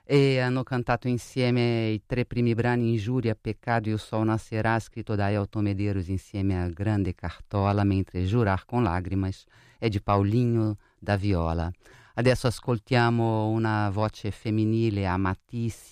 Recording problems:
none

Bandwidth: 14.5 kHz